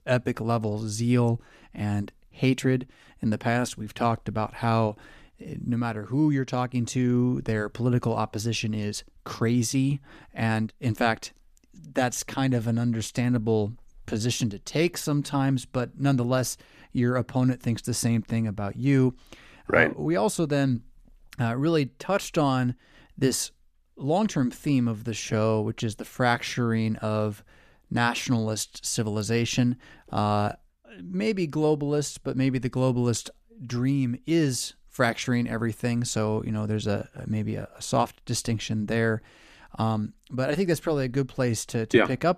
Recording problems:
none

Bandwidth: 14.5 kHz